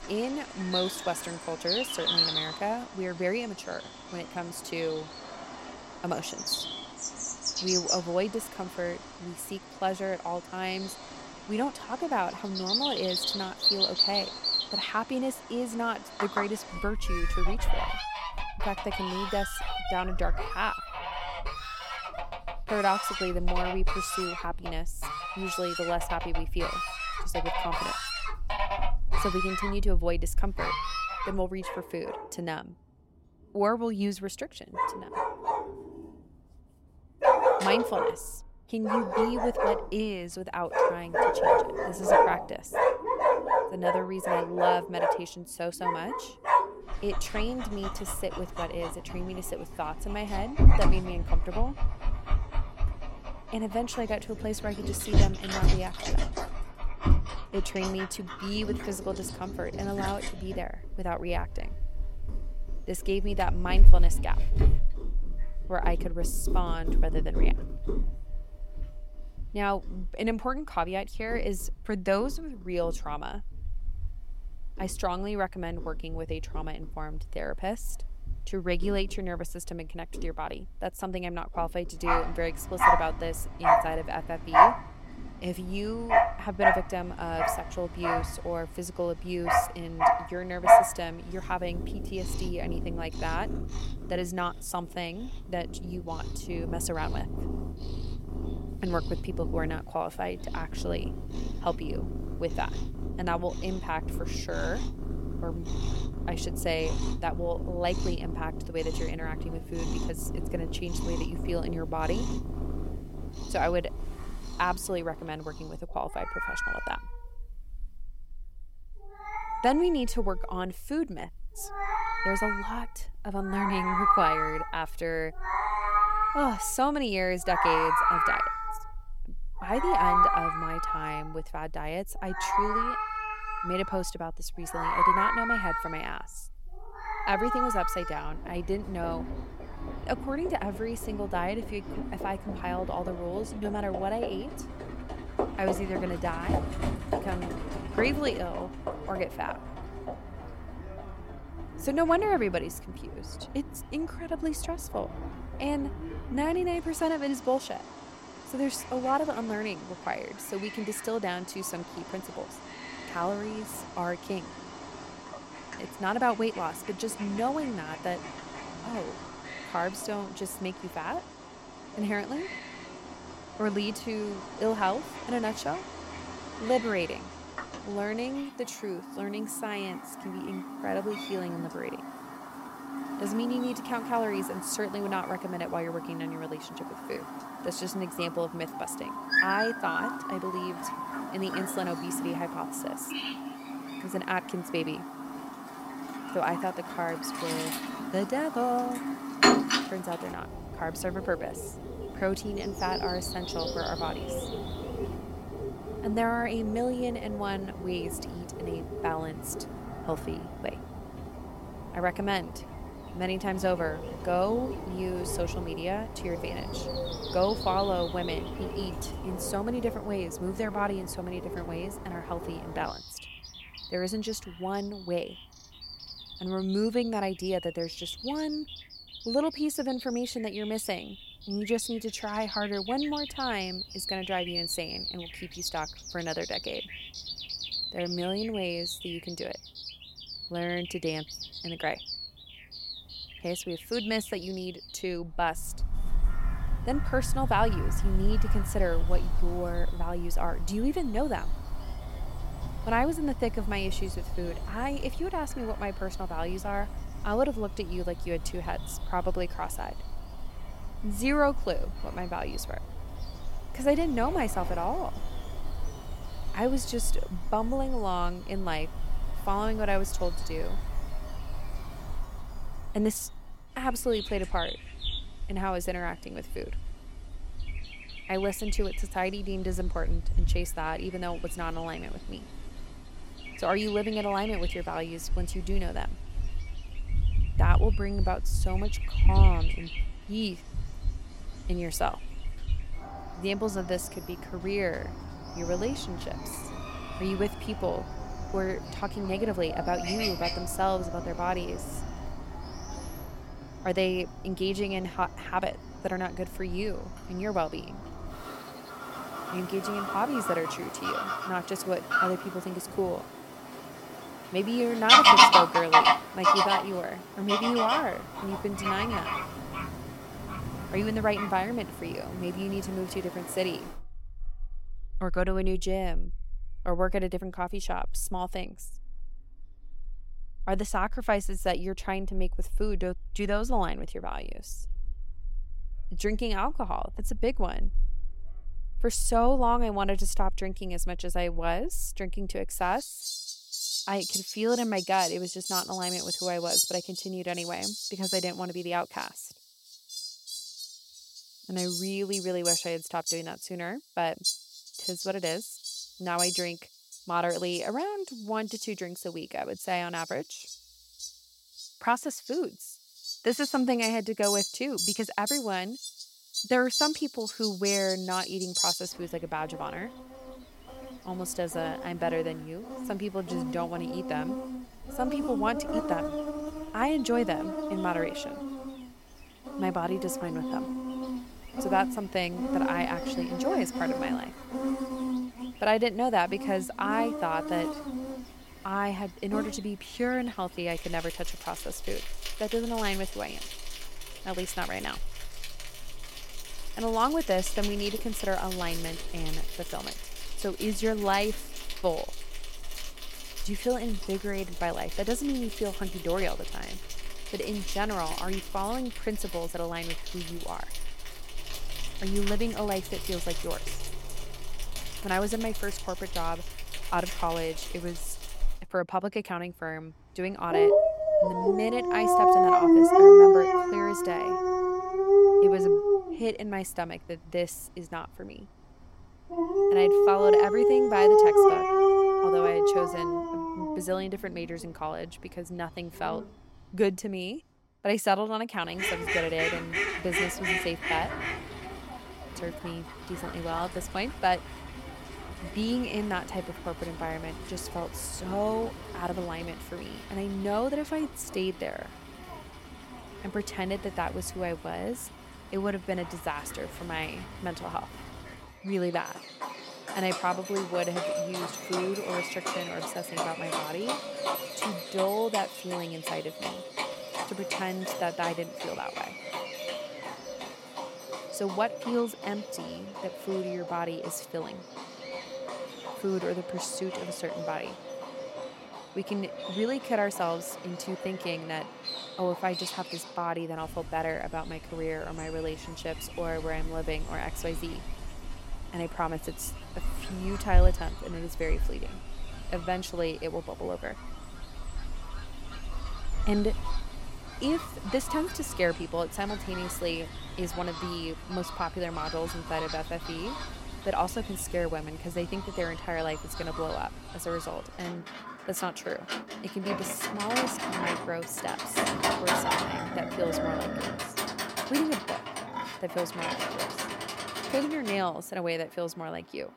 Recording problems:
animal sounds; very loud; throughout; 2 dB above the speech

